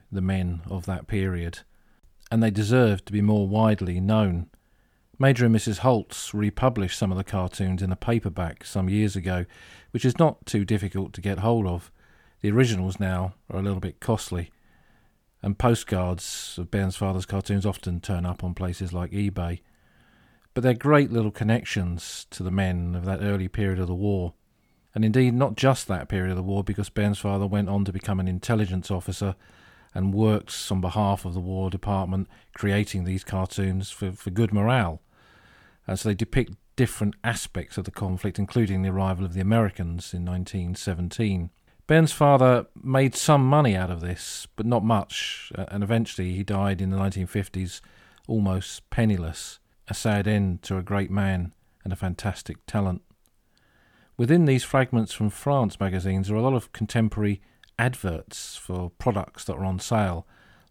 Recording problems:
none

